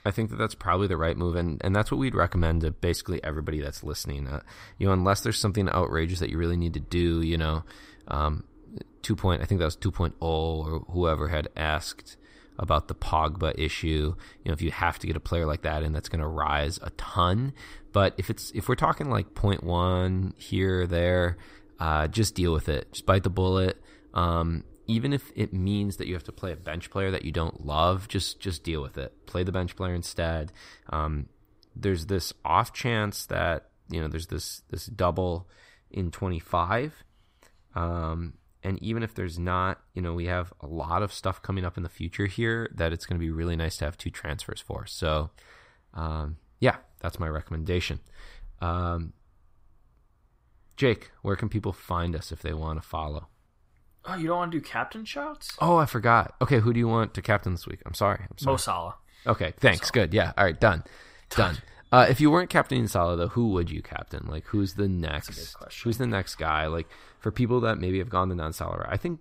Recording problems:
none

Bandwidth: 15.5 kHz